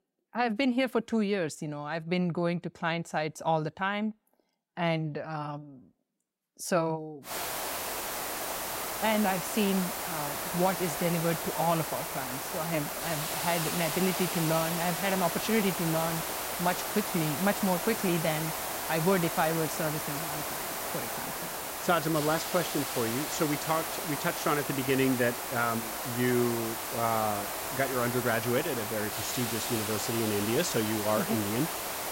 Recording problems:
hiss; loud; from 7.5 s on; 2 dB below the speech

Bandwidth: 16 kHz